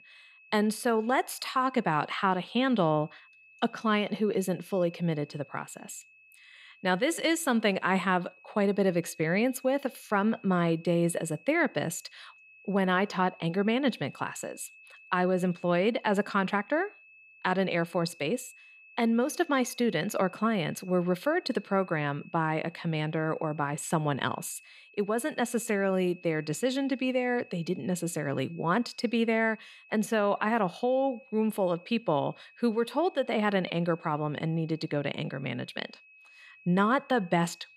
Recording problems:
high-pitched whine; faint; throughout; 2.5 kHz, 25 dB below the speech

